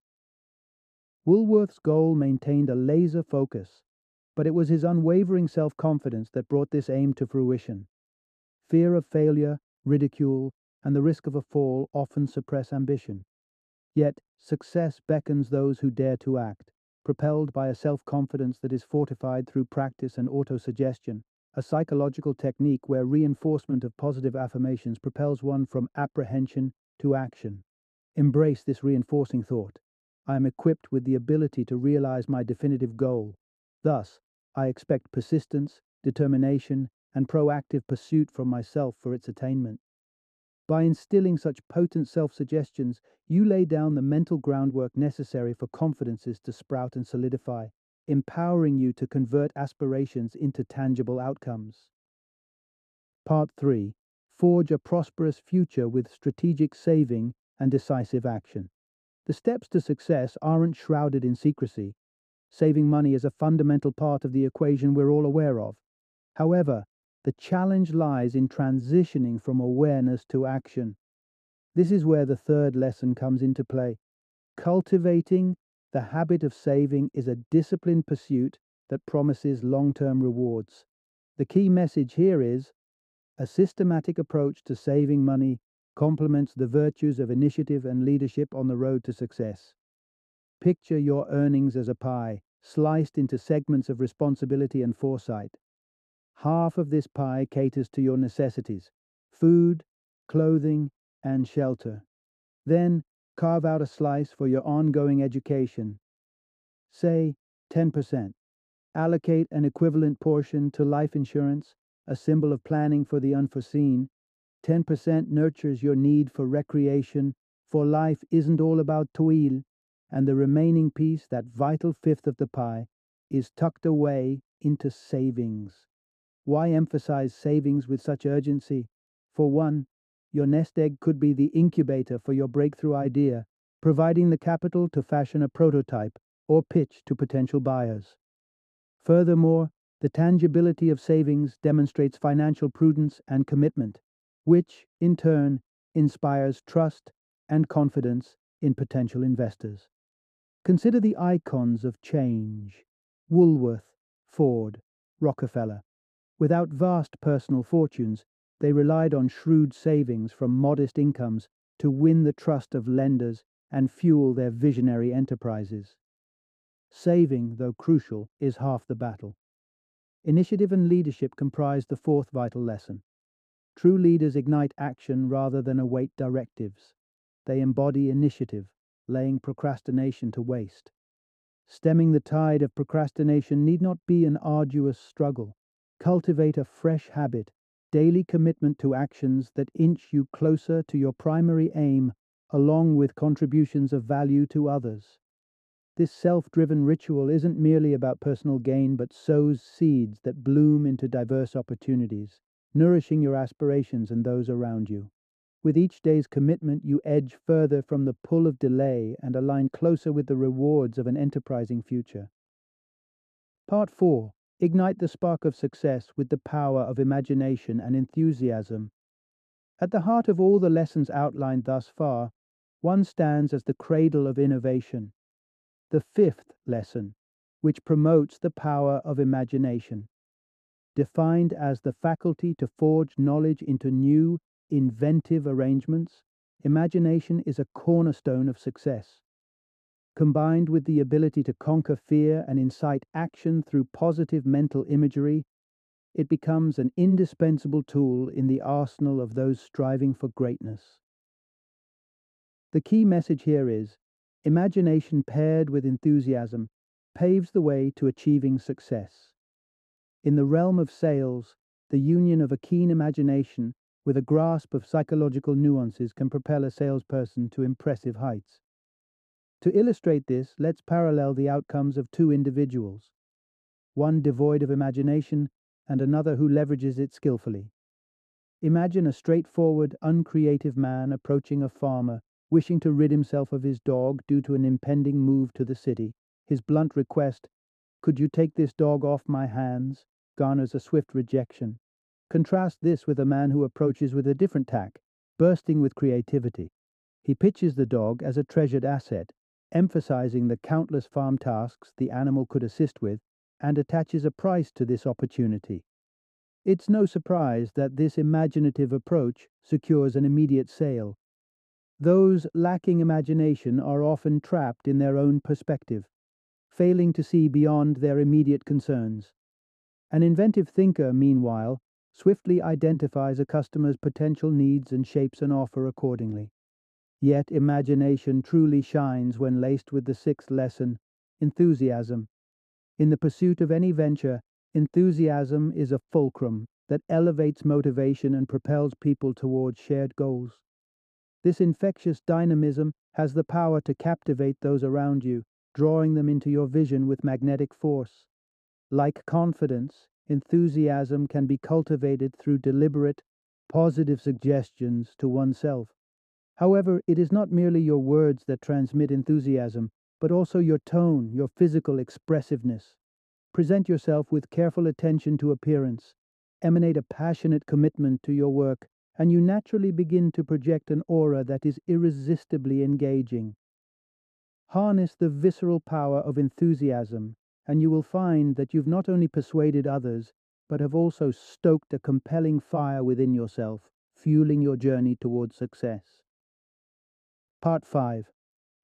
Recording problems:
muffled; slightly; fading above 1 kHz

